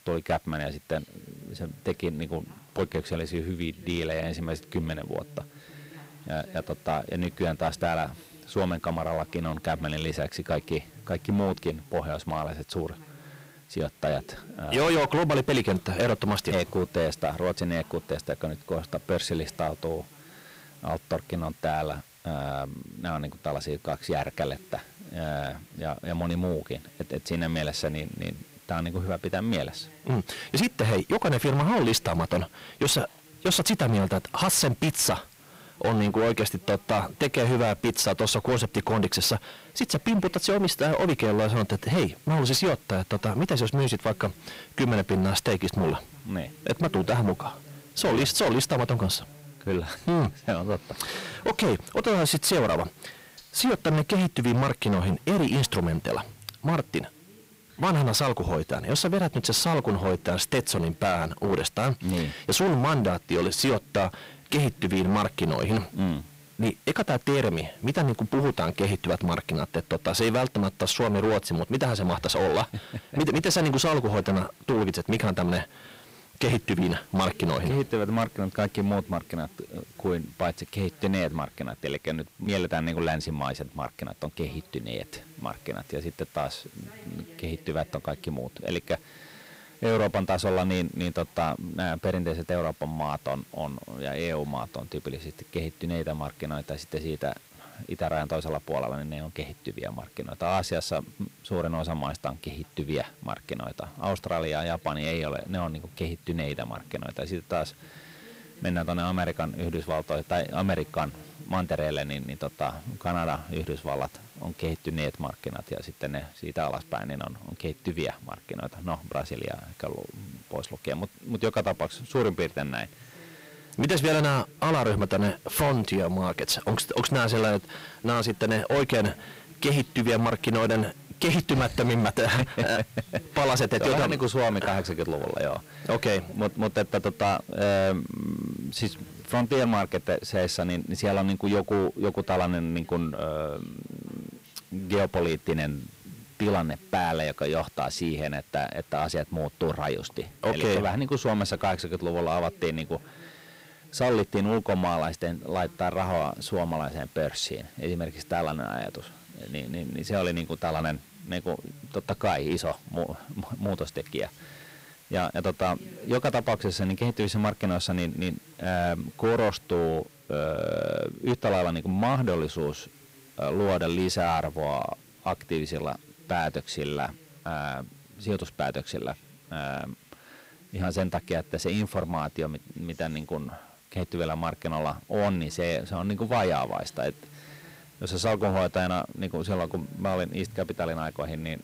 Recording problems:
distortion; heavy; 9% of the sound clipped
voice in the background; faint; throughout; 25 dB below the speech
hiss; faint; throughout; 25 dB below the speech

